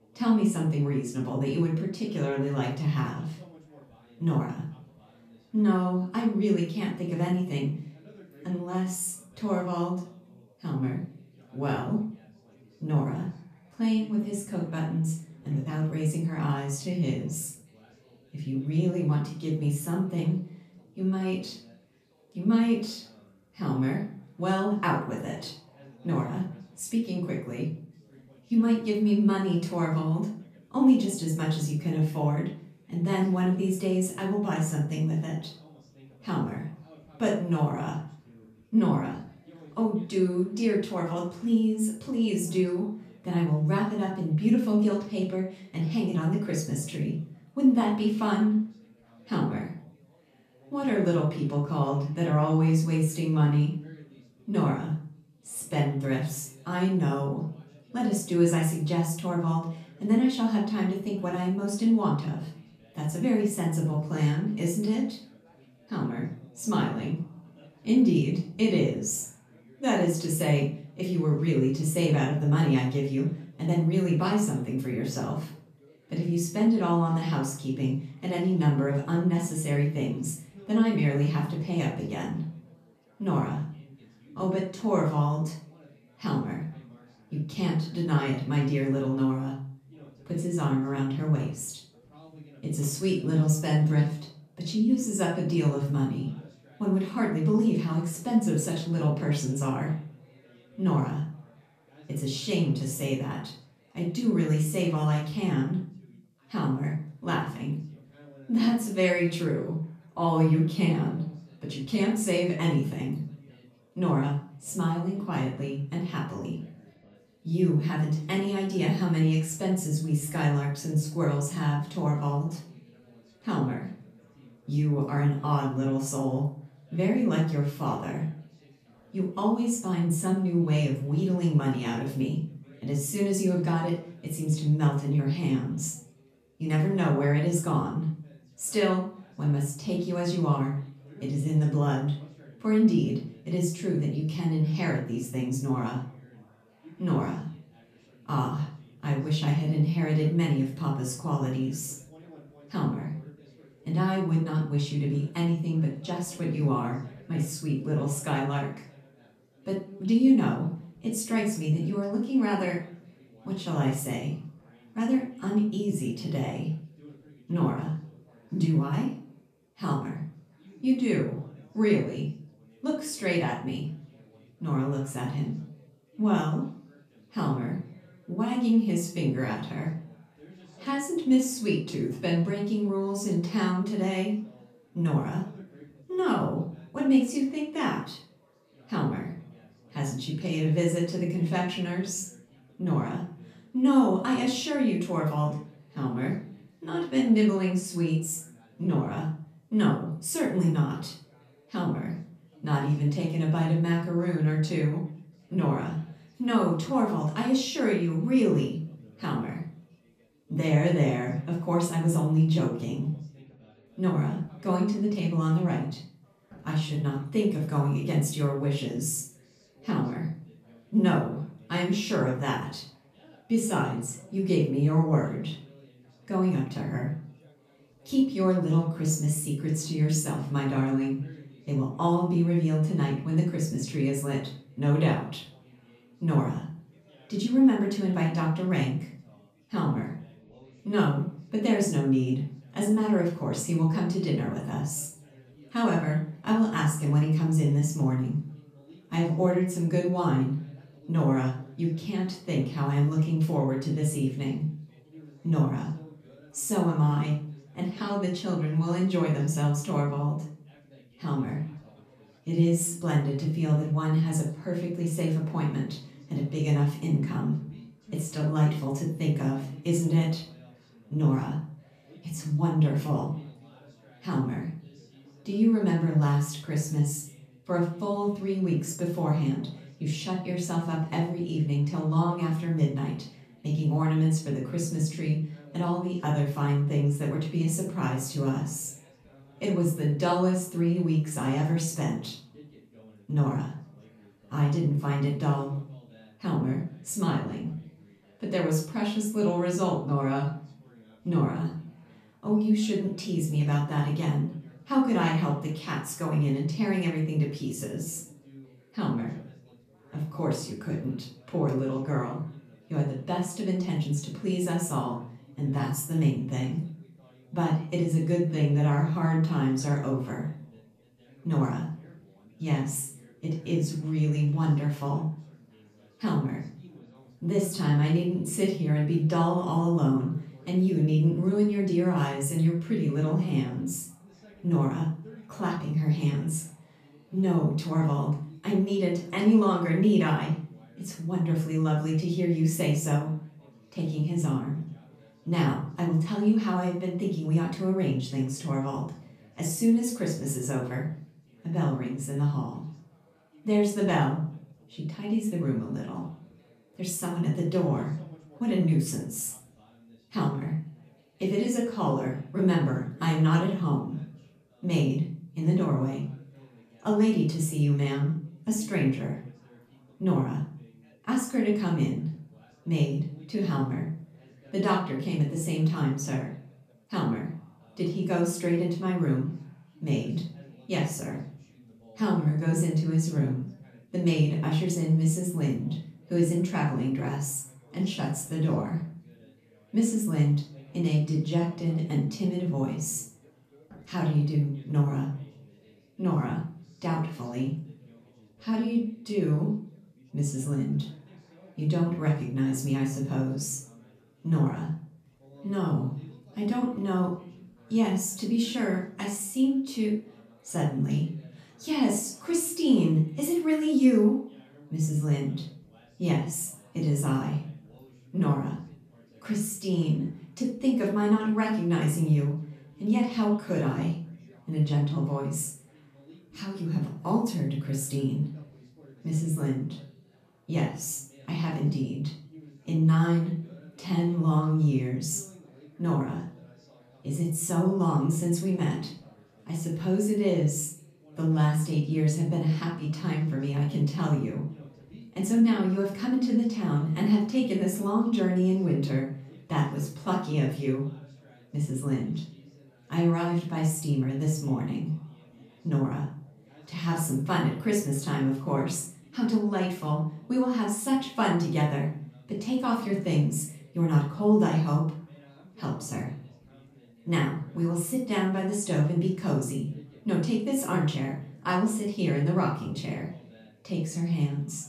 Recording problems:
off-mic speech; far
room echo; noticeable; dies away in 0.4 s
background chatter; faint; throughout; 4 voices, 30 dB below the speech

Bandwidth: 14.5 kHz